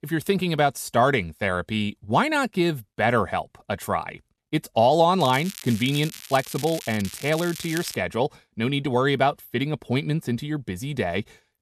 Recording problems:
crackling; noticeable; from 5 to 8 s; 15 dB below the speech

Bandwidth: 14 kHz